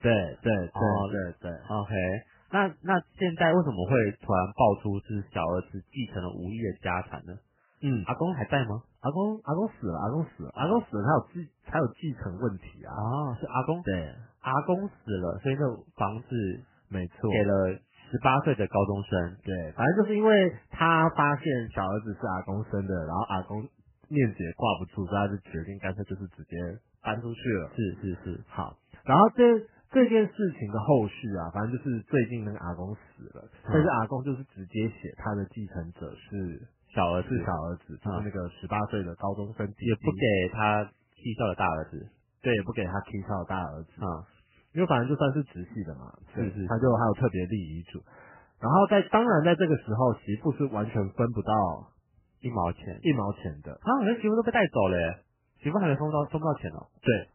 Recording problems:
garbled, watery; badly; nothing above 3 kHz

